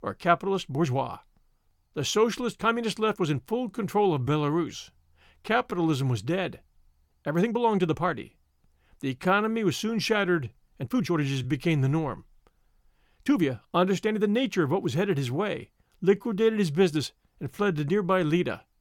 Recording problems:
uneven, jittery; strongly; from 0.5 to 18 s

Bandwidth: 17.5 kHz